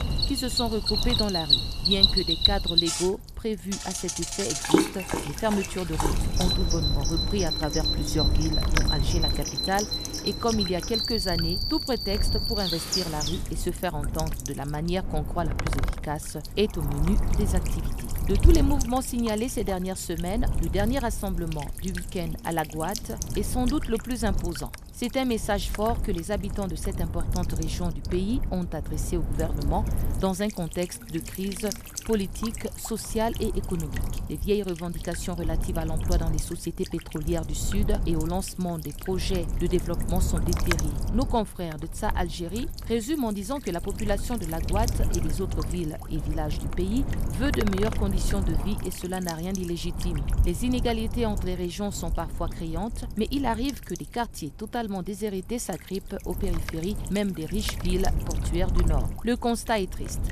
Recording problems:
animal sounds; very loud; until 13 s; 4 dB above the speech
wind noise on the microphone; heavy; 10 dB below the speech
electrical hum; noticeable; throughout; 50 Hz, 10 dB below the speech

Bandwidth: 14 kHz